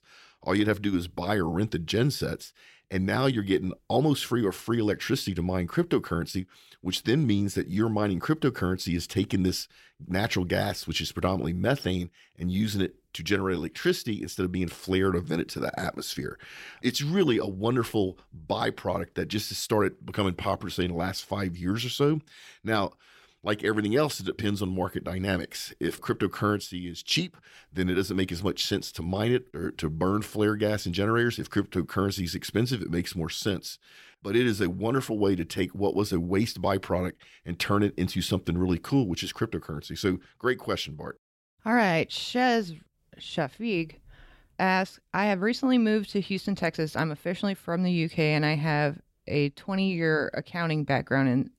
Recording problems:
none

